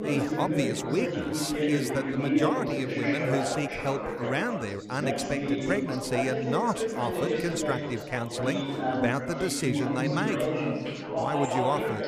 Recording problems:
chatter from many people; very loud; throughout; 1 dB above the speech

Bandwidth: 15 kHz